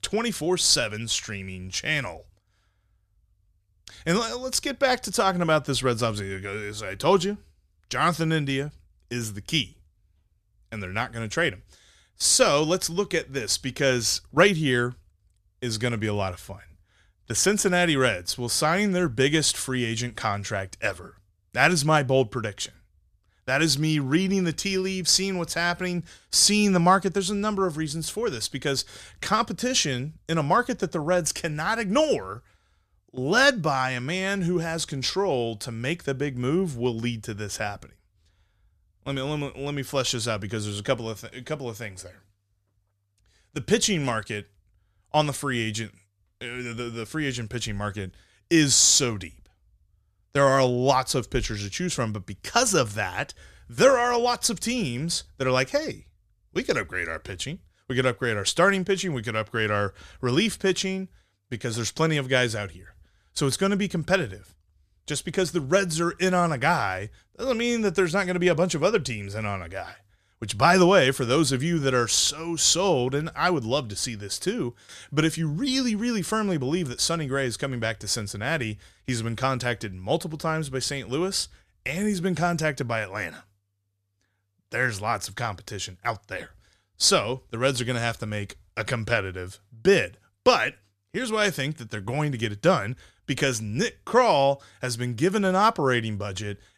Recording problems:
none

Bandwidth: 14.5 kHz